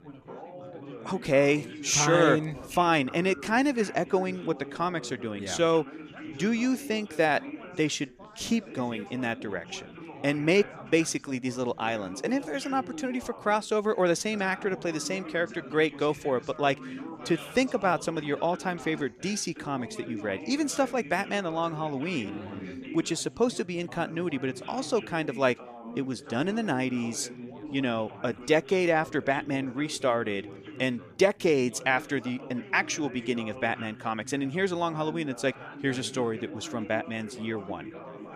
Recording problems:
background chatter; noticeable; throughout; 4 voices, 15 dB below the speech

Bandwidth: 14.5 kHz